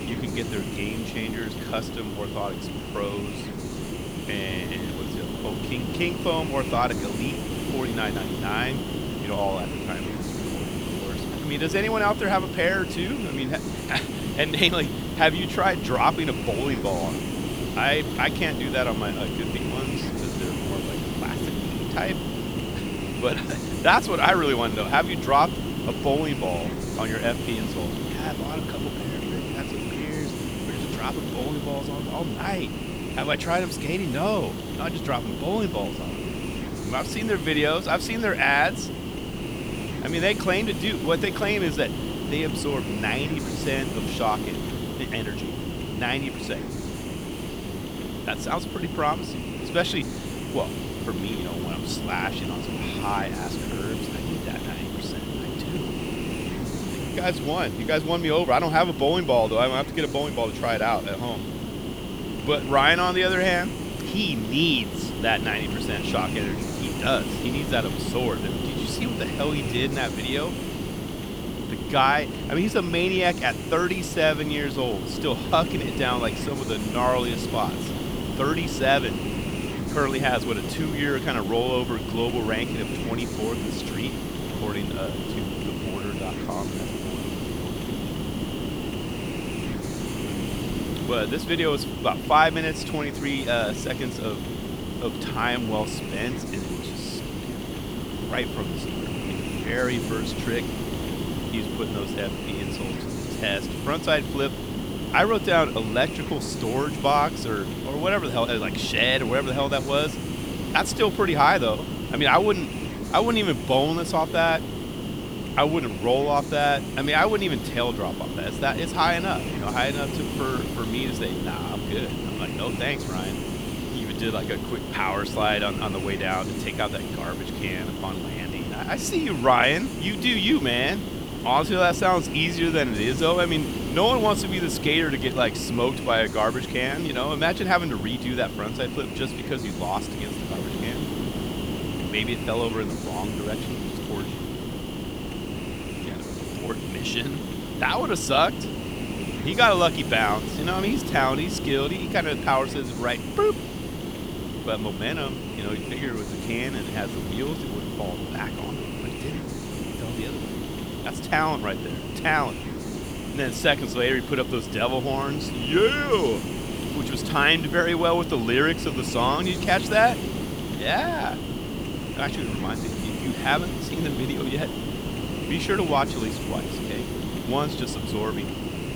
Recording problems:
hiss; loud; throughout; 5 dB below the speech

